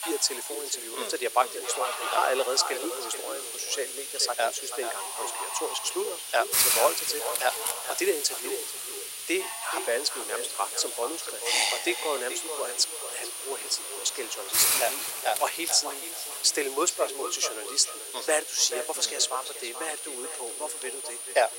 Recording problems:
echo of what is said; strong; throughout; 430 ms later, 10 dB below the speech
thin; very; fading below 400 Hz
high-pitched whine; loud; throughout; 9.5 kHz, 9 dB below the speech
hiss; loud; throughout; 4 dB below the speech
animal sounds; noticeable; throughout; 15 dB below the speech

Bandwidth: 16 kHz